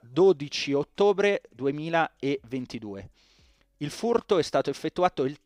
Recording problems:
none

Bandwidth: 15.5 kHz